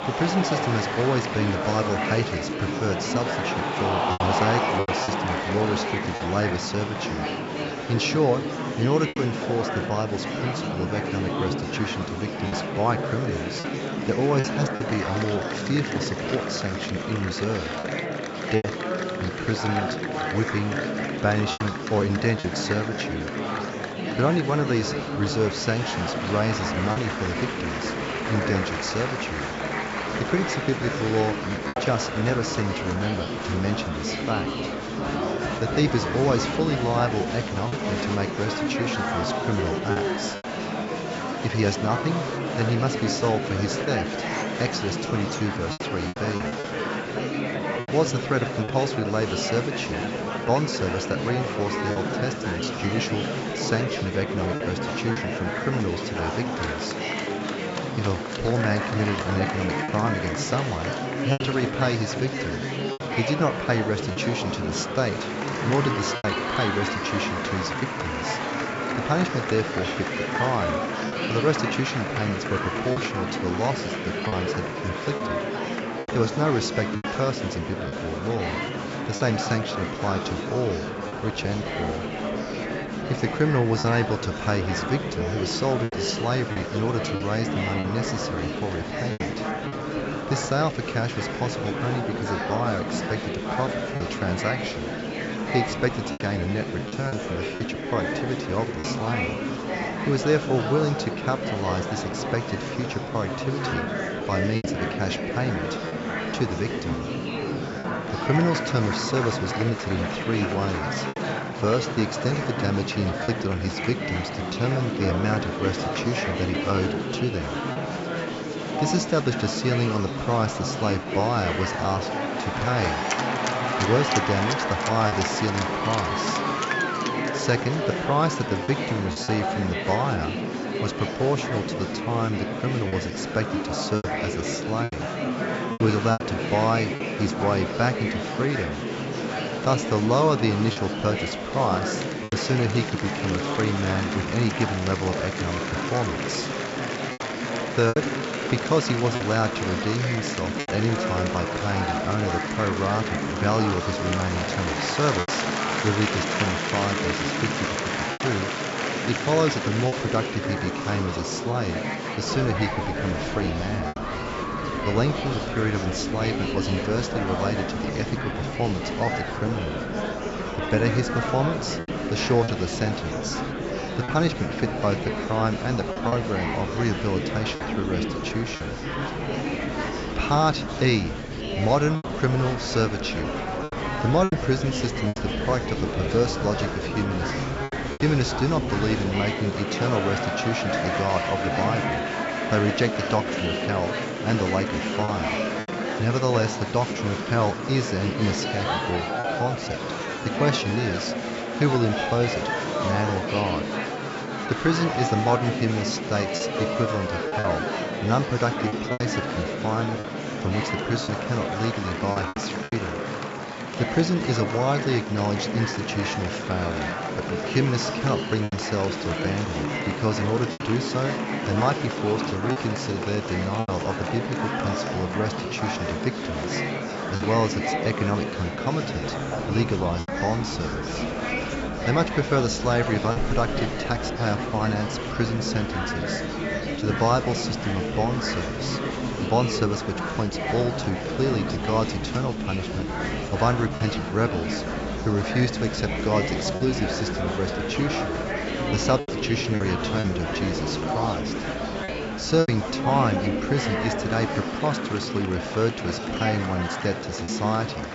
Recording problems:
high frequencies cut off; noticeable; nothing above 8 kHz
murmuring crowd; loud; throughout; 1 dB below the speech
household noises; faint; throughout; 30 dB below the speech
choppy; occasionally; 3% of the speech affected

